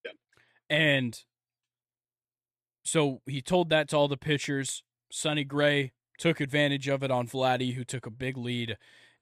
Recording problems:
none

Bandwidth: 14.5 kHz